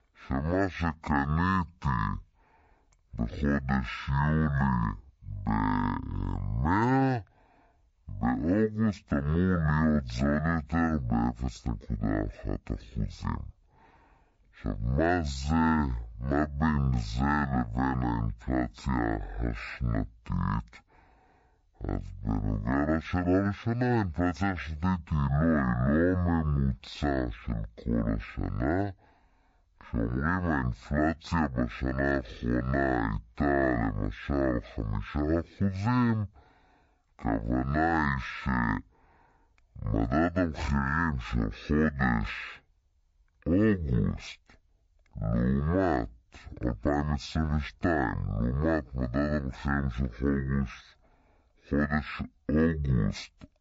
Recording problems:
wrong speed and pitch; too slow and too low; 0.5 times normal speed

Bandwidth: 7.5 kHz